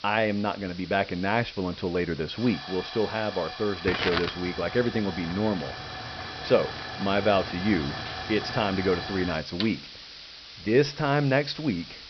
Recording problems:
high frequencies cut off; noticeable; nothing above 5.5 kHz
hiss; loud; throughout; 8 dB below the speech

